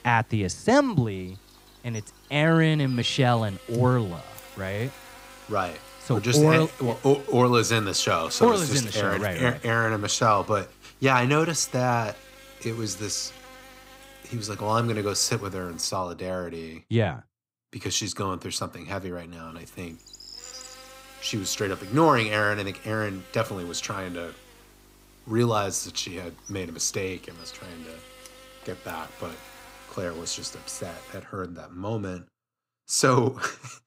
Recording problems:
electrical hum; noticeable; until 16 s and from 19 to 31 s; 50 Hz, 20 dB below the speech

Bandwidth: 15.5 kHz